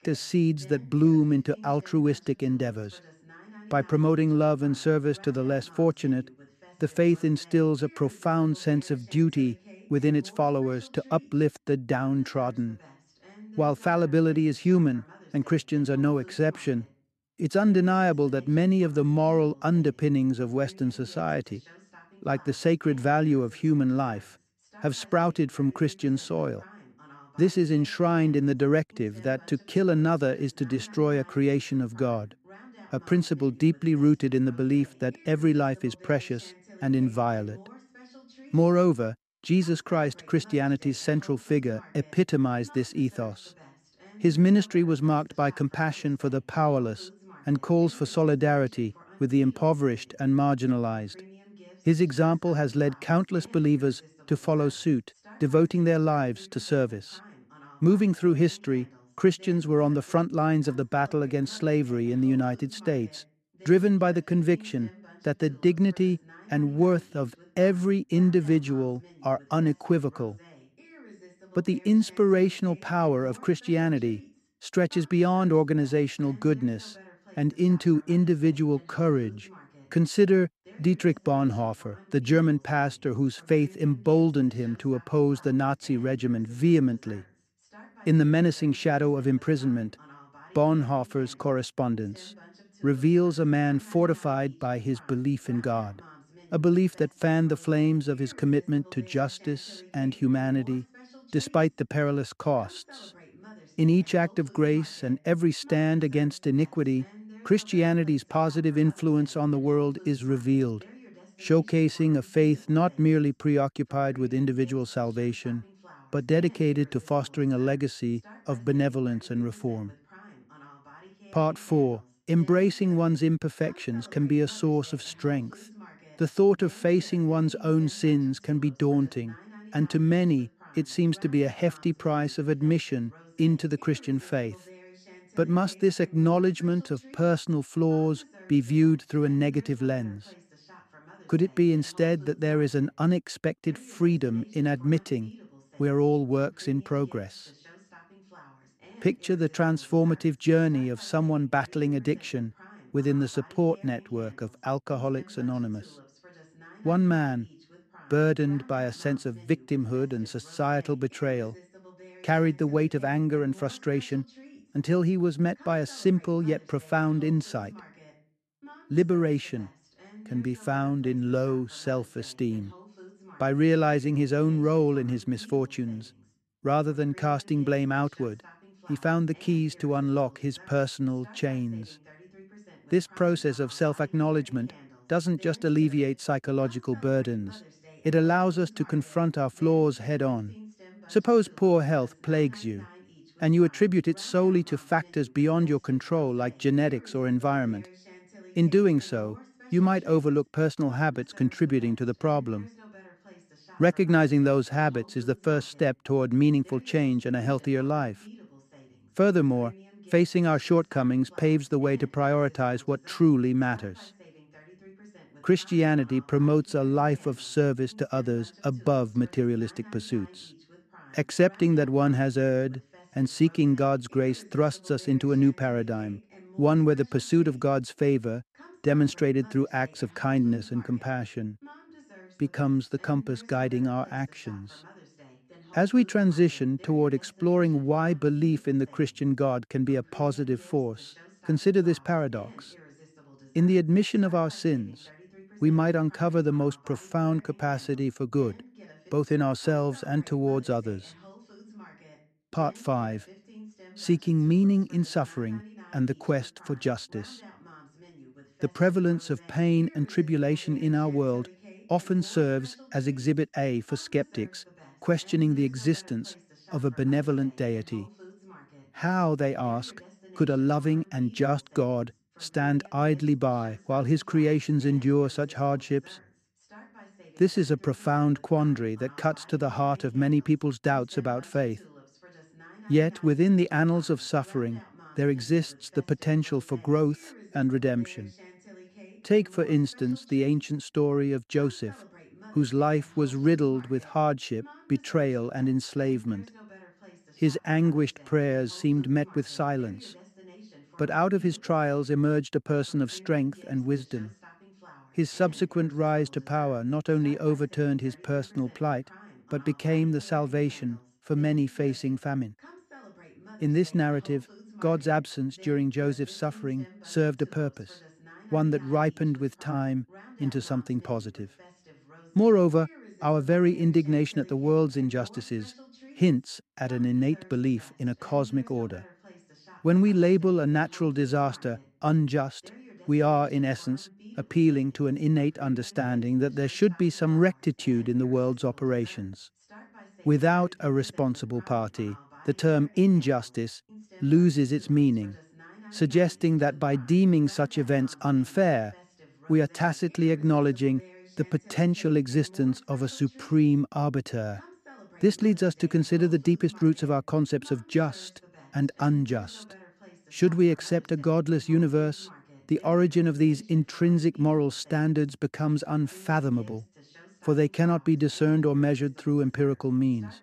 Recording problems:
voice in the background; faint; throughout; 25 dB below the speech

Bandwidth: 14 kHz